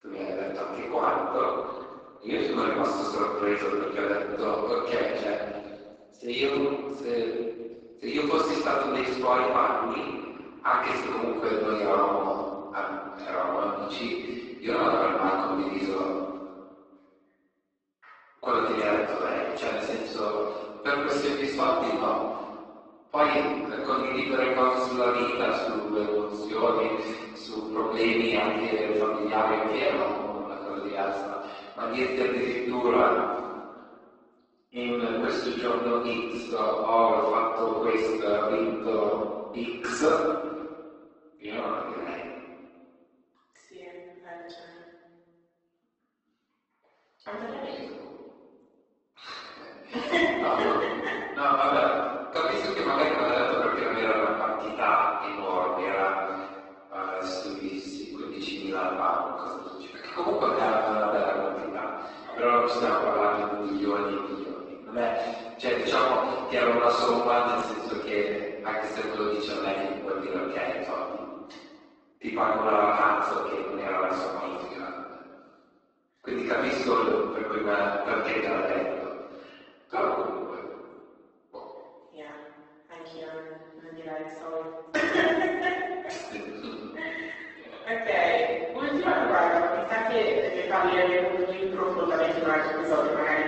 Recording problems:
room echo; strong; dies away in 1.5 s
off-mic speech; far
thin; somewhat; fading below 300 Hz
garbled, watery; slightly; nothing above 8 kHz

